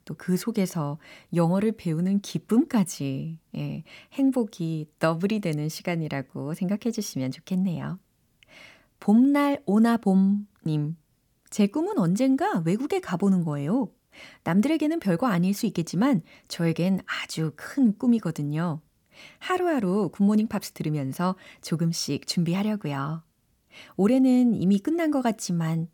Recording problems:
none

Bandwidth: 18 kHz